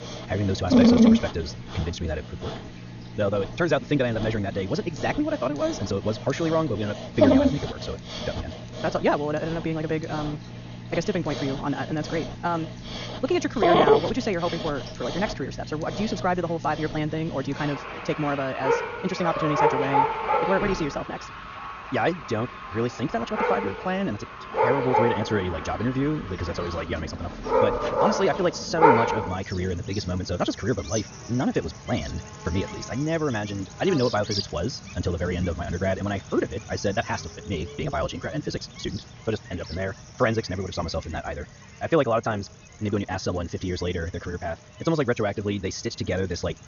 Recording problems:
wrong speed, natural pitch; too fast; 1.7 times normal speed
high frequencies cut off; noticeable; nothing above 7 kHz
animal sounds; very loud; throughout; as loud as the speech

